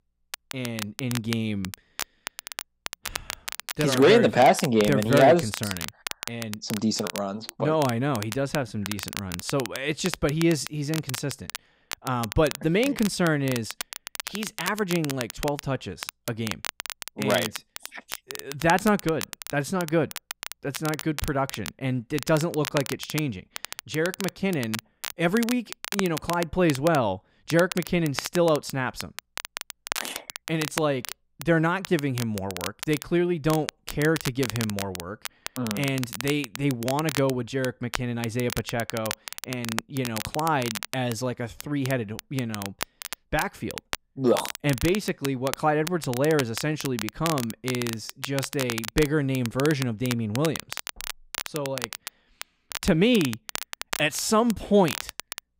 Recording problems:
crackle, like an old record; loud; 9 dB below the speech

